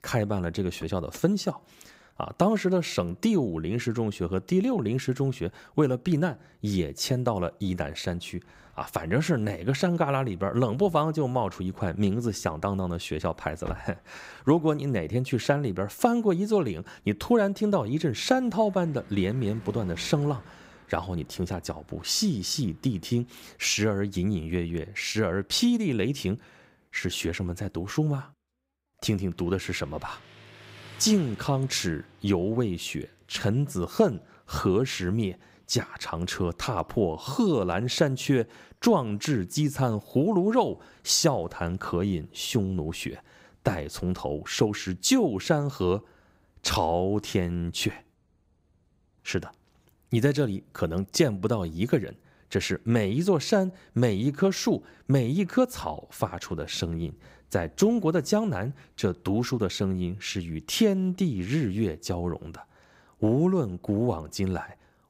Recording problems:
traffic noise; faint; throughout; 25 dB below the speech

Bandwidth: 15.5 kHz